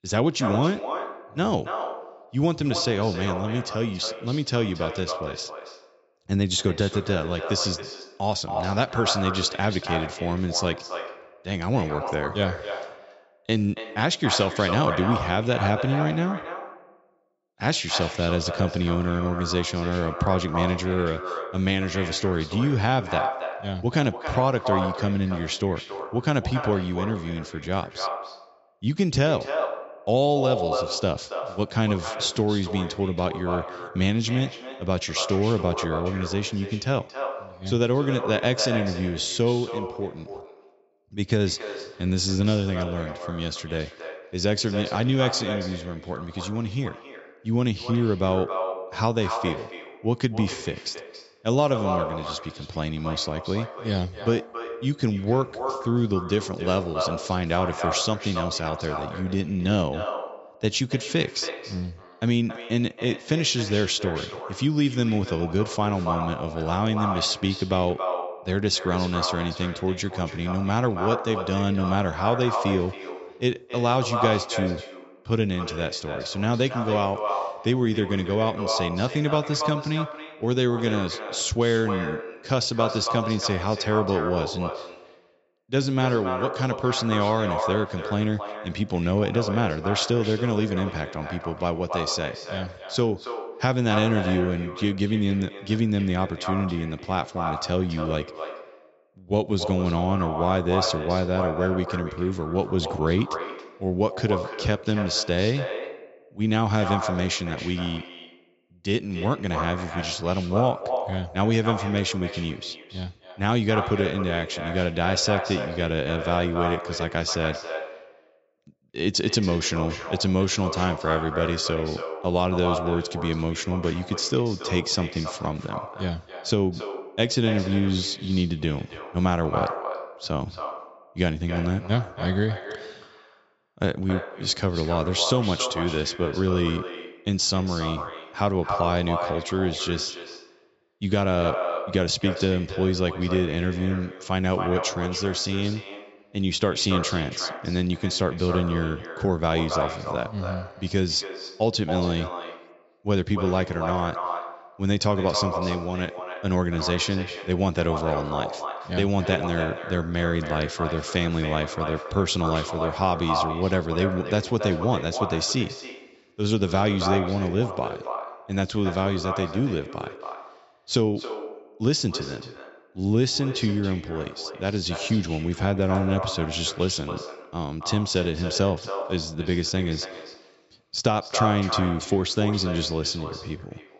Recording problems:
echo of what is said; strong; throughout; 280 ms later, 7 dB below the speech
high frequencies cut off; noticeable; nothing above 7.5 kHz

